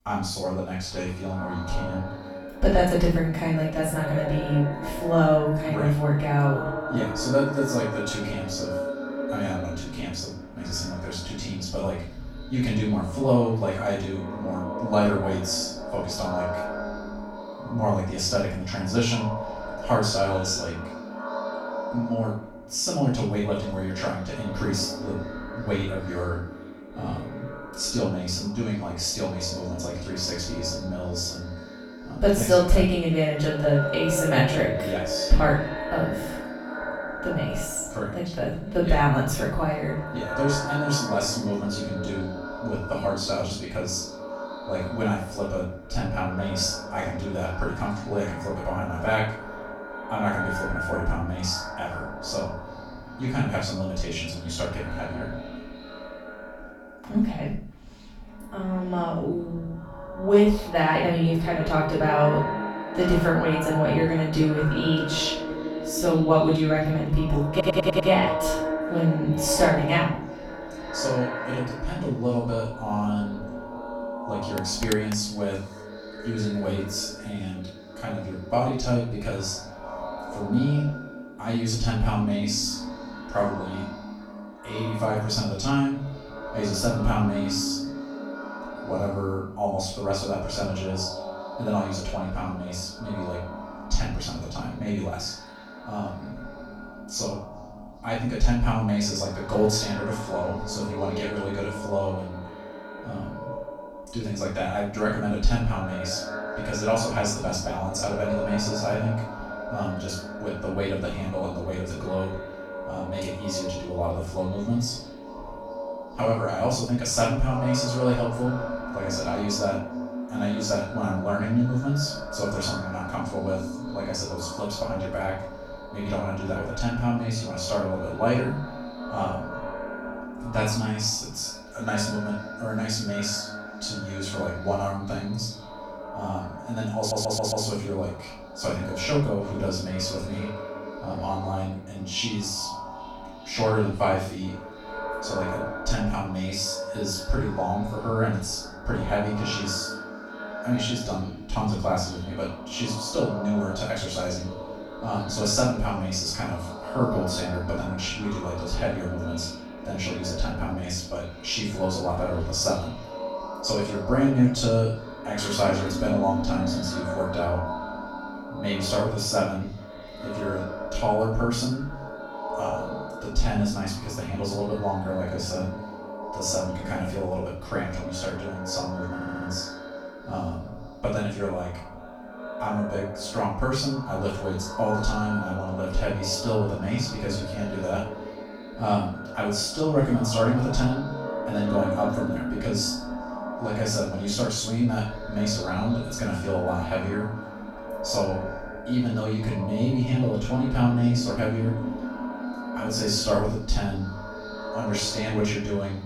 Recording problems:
echo of what is said; strong; throughout; 400 ms later, 8 dB below the speech
off-mic speech; far
room echo; noticeable; dies away in 0.4 s
audio stuttering; at 1:08, at 2:17 and at 2:59
phone ringing; noticeable; at 1:15; peak 7 dB below the speech

